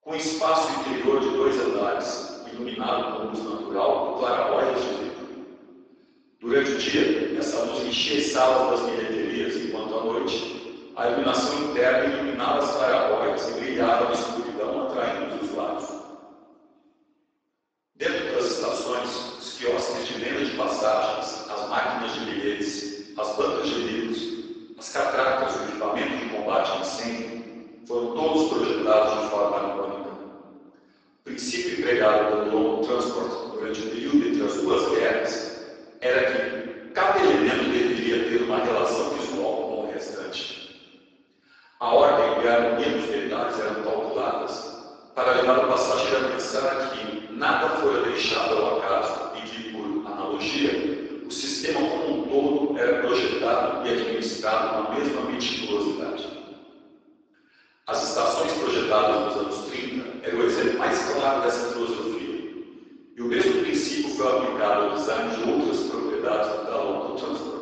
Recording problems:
room echo; strong; dies away in 1.8 s
off-mic speech; far
garbled, watery; badly; nothing above 7.5 kHz
thin; somewhat; fading below 350 Hz

